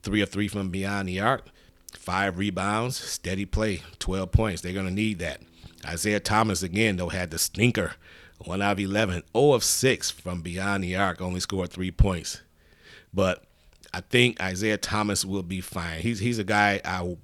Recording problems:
none

